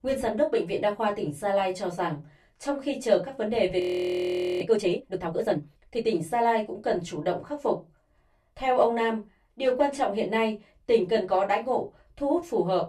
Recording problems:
off-mic speech; far
room echo; very slight; dies away in 0.2 s
audio freezing; at 4 s for 1 s

